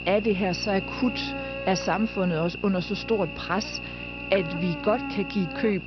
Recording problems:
high frequencies cut off; noticeable; nothing above 5.5 kHz
electrical hum; loud; throughout; 60 Hz, 5 dB below the speech

